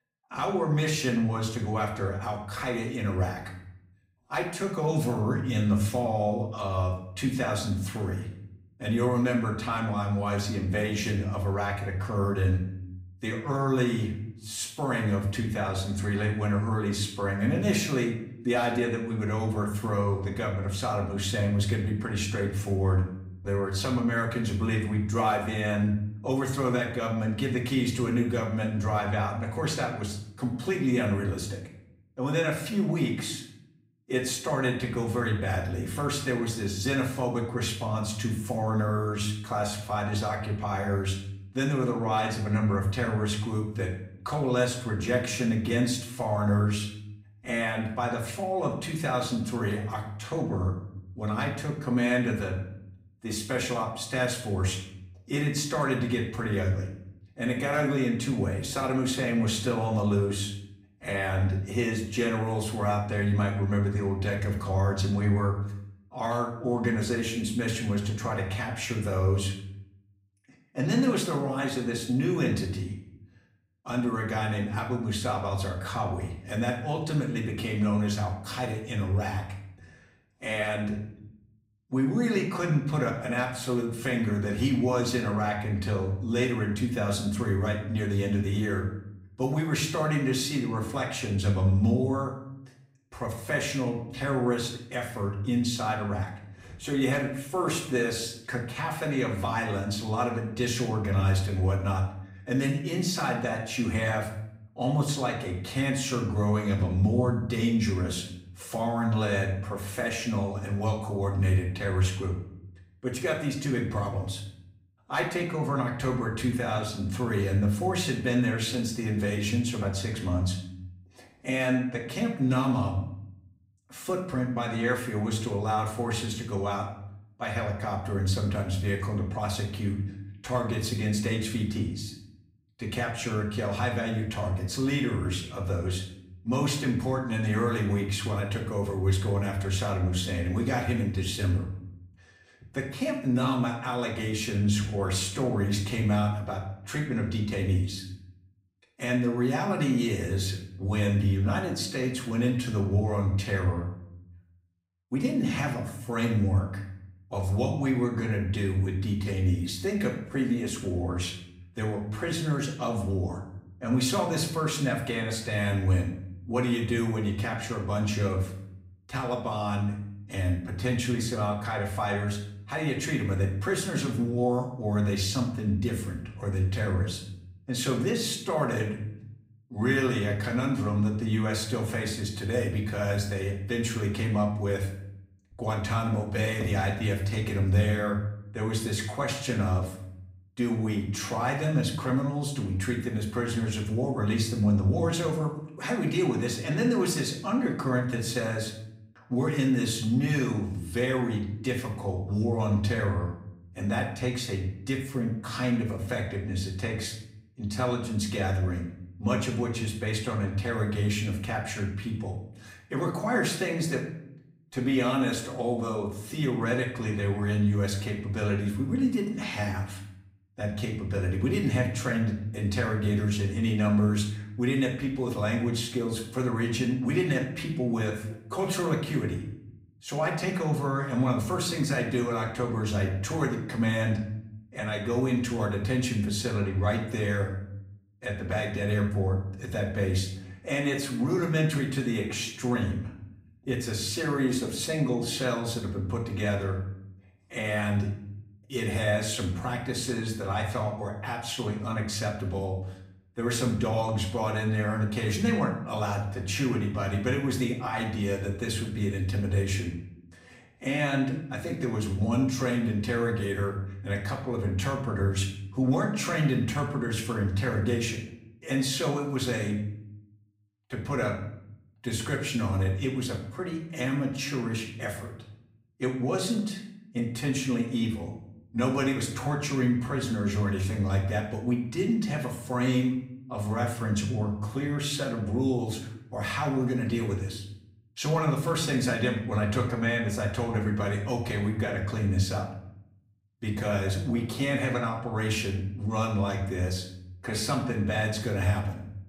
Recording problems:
off-mic speech; far
room echo; slight; dies away in 0.6 s

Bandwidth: 15.5 kHz